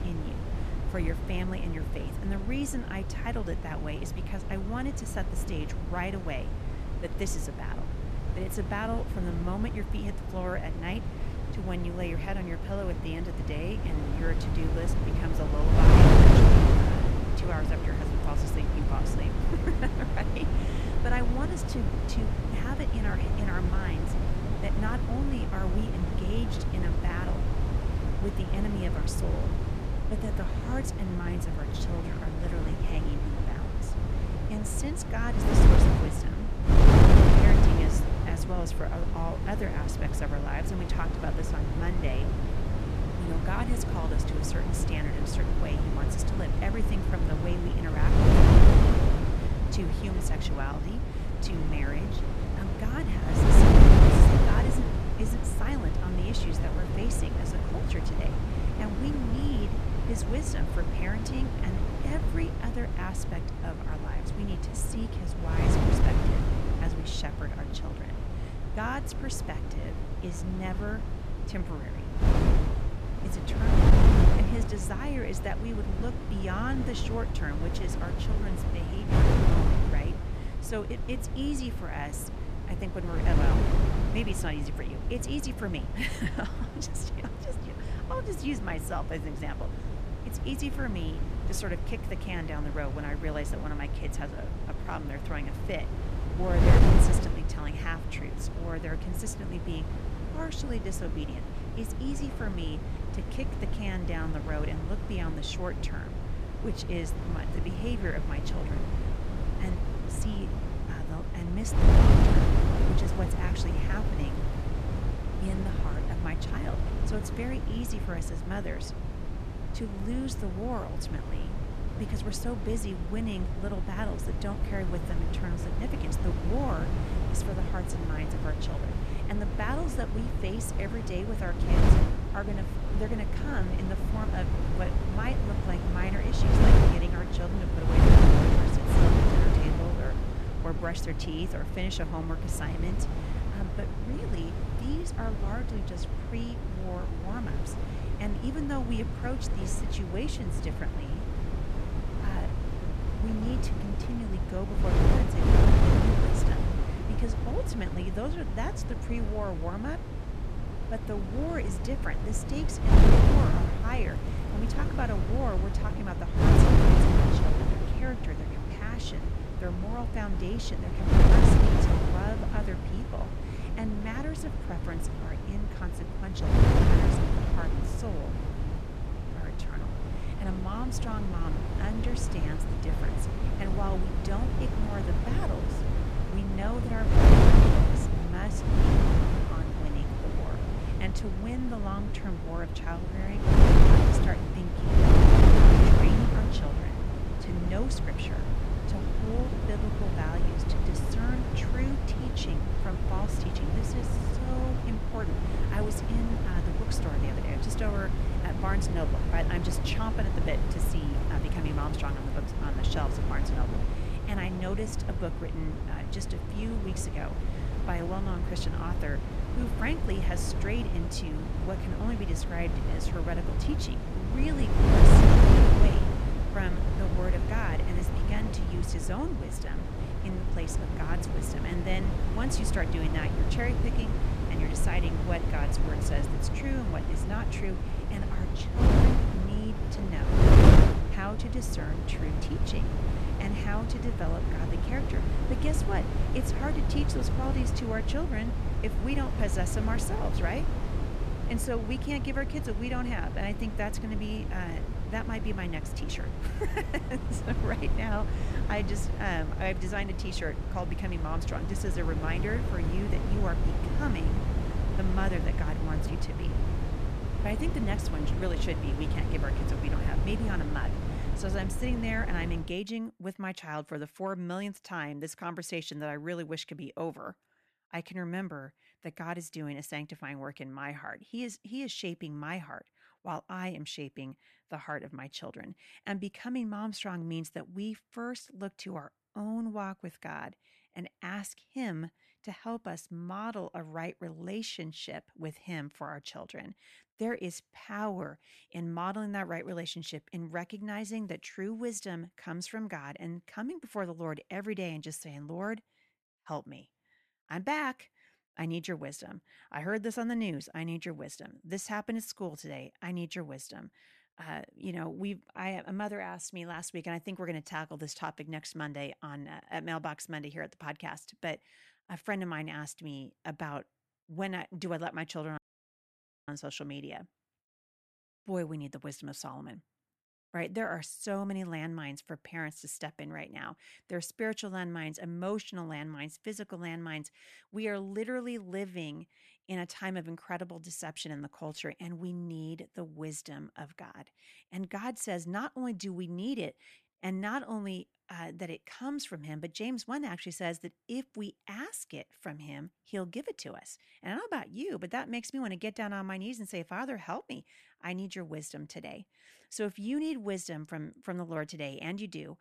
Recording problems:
wind noise on the microphone; heavy; until 4:33; 2 dB above the speech
crackling; very faint; 4 times, first at 1:53; 30 dB below the speech
audio cutting out; at 5:26 for 1 s

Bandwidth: 14 kHz